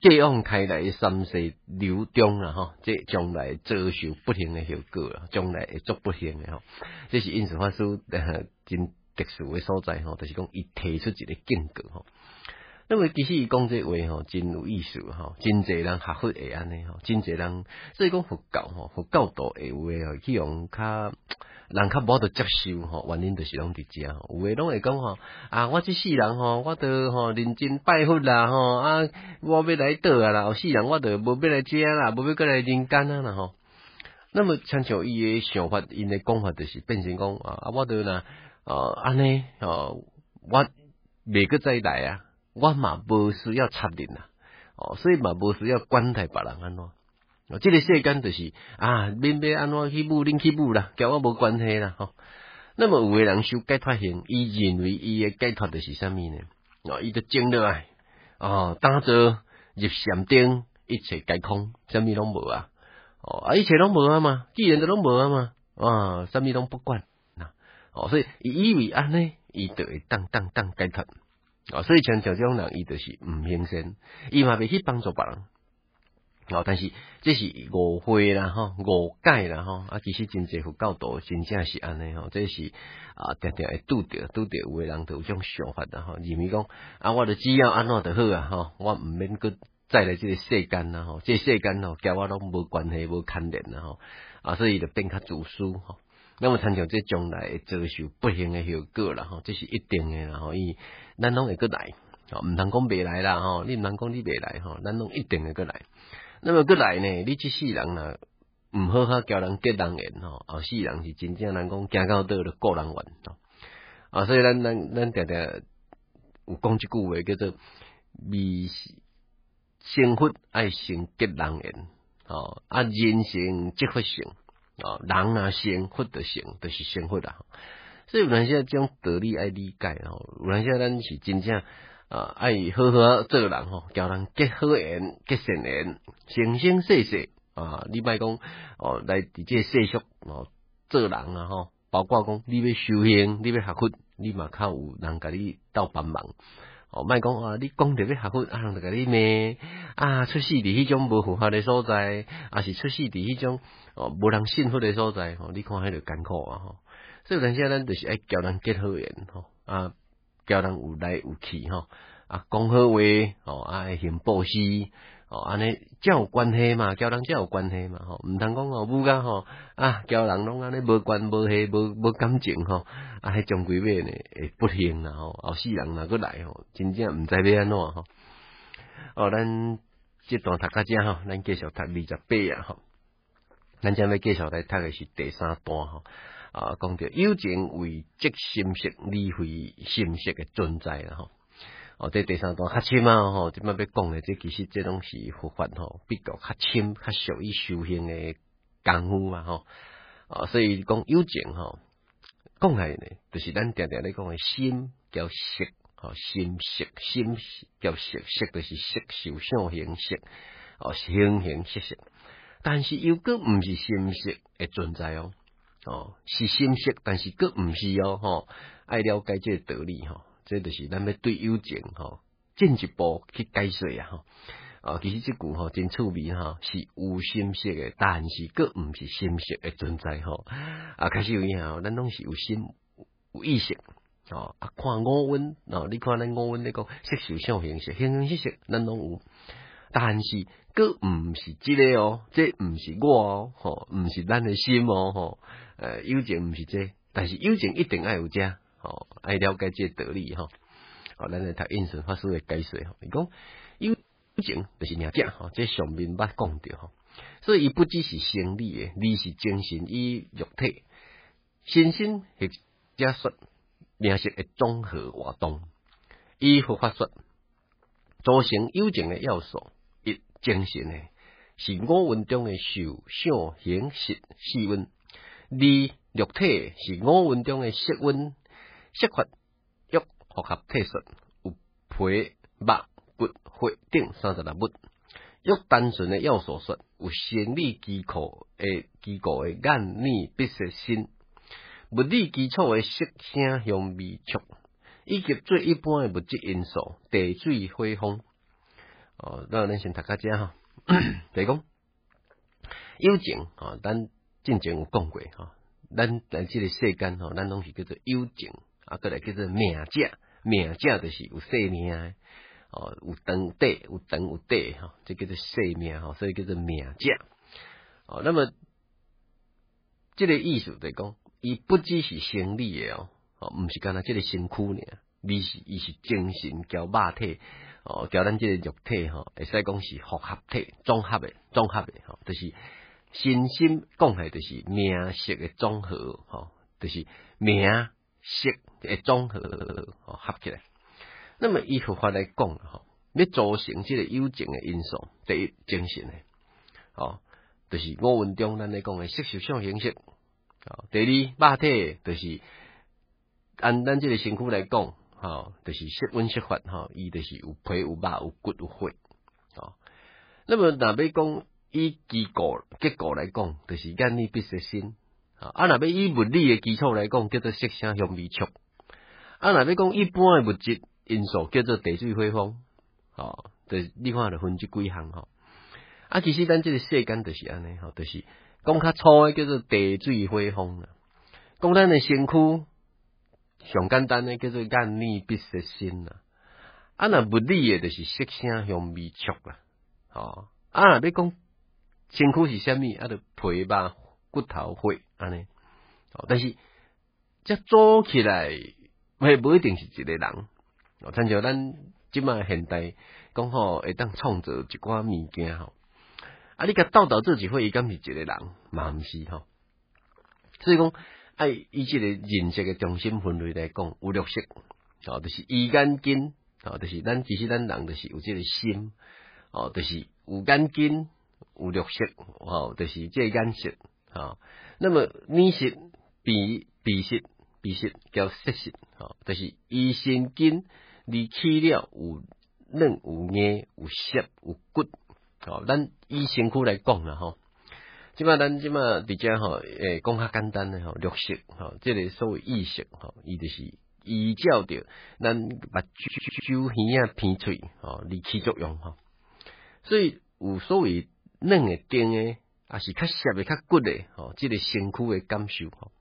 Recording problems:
garbled, watery; badly; nothing above 4.5 kHz
audio freezing; at 1:07, at 4:14 and at 4:23
audio stuttering; at 1:10, at 5:39 and at 7:26

